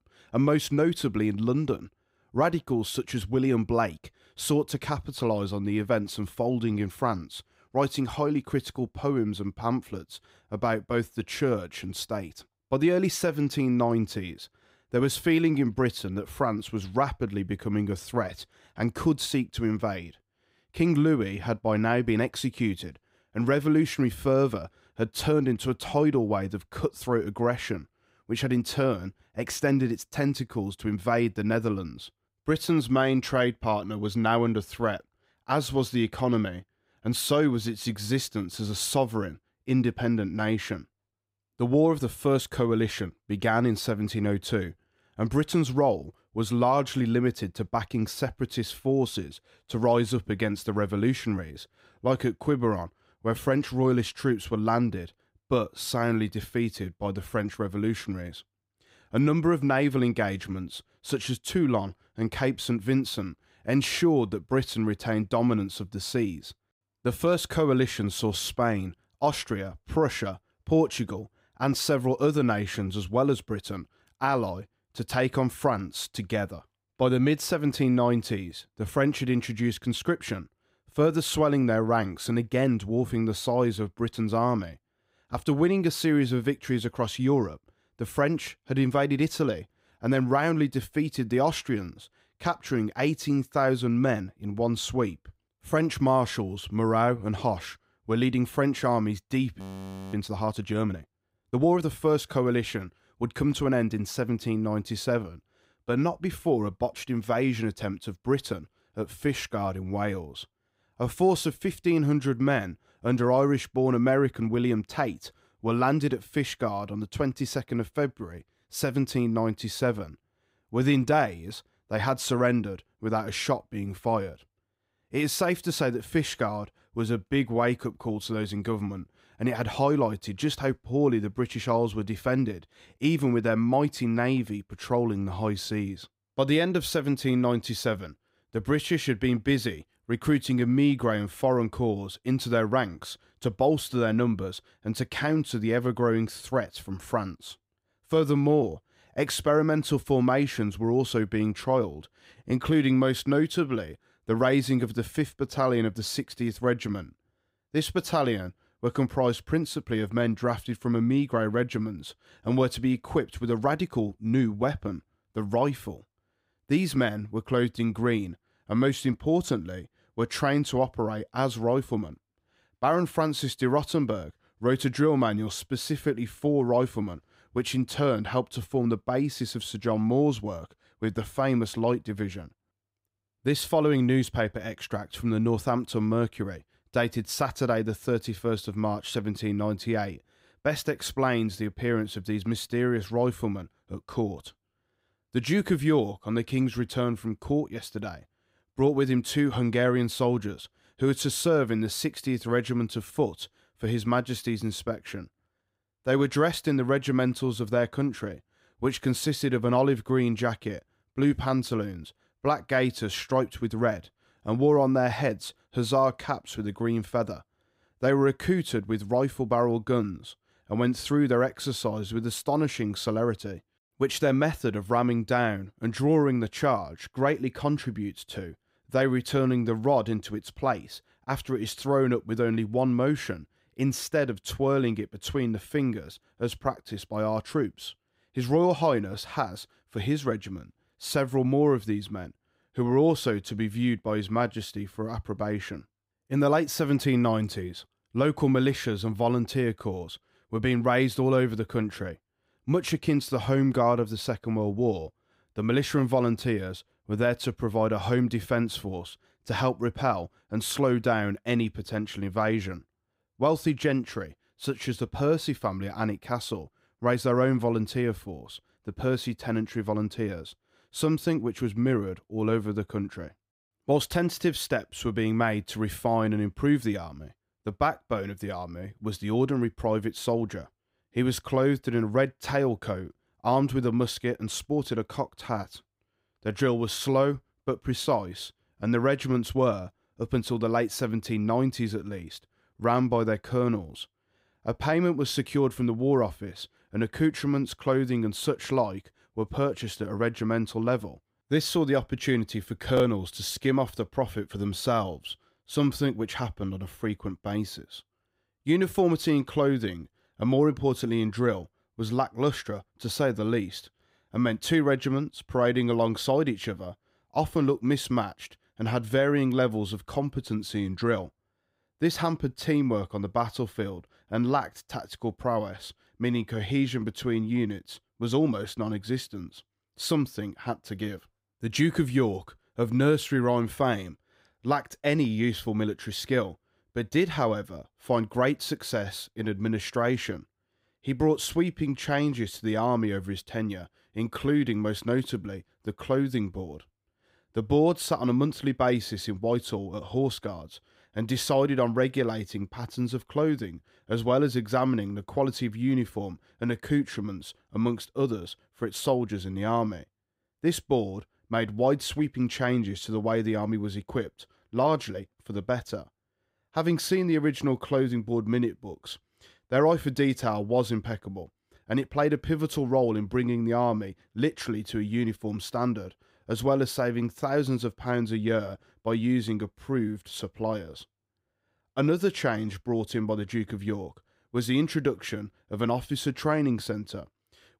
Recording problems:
audio freezing; at 1:40 for 0.5 s

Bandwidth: 15.5 kHz